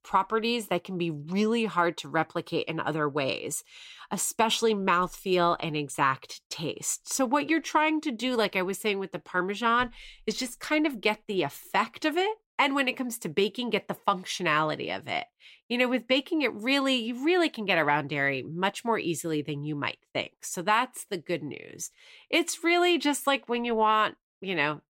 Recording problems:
none

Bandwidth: 16 kHz